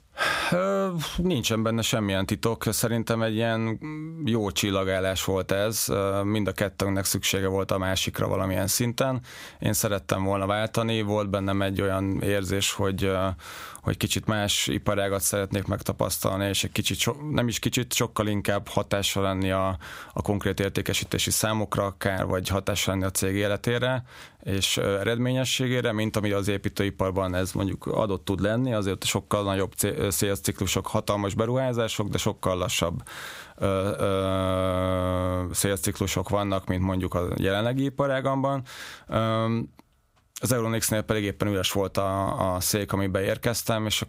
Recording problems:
squashed, flat; somewhat

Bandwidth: 15.5 kHz